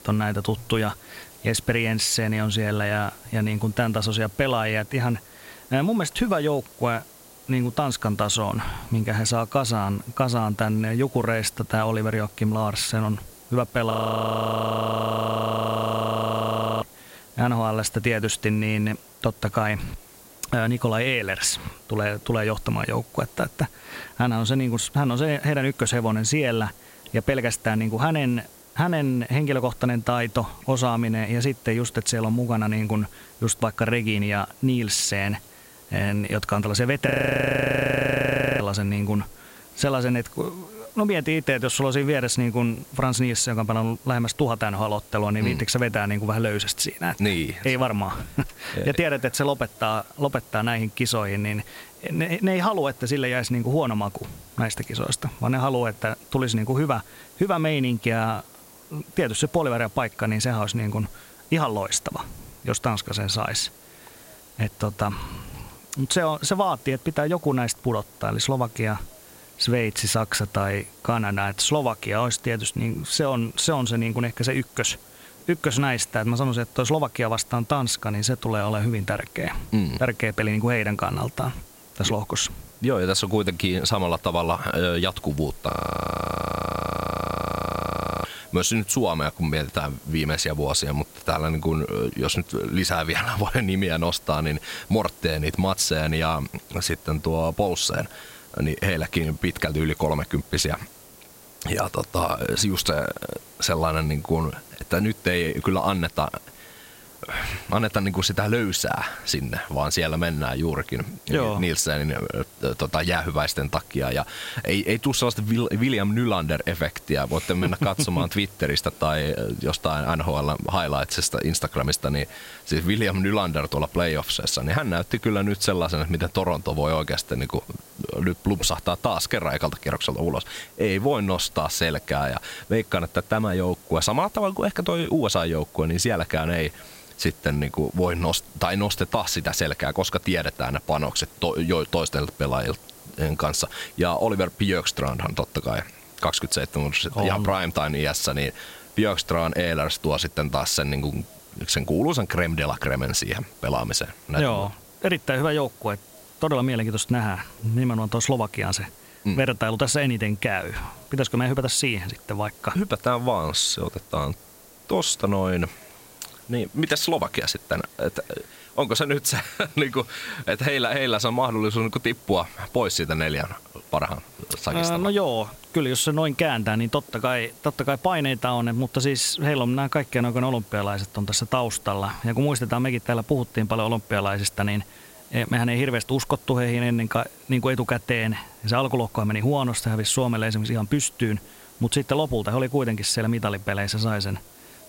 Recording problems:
squashed, flat; somewhat
hiss; faint; throughout; 20 dB below the speech
audio freezing; at 14 s for 3 s, at 37 s for 1.5 s and at 1:26 for 2.5 s

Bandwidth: 16 kHz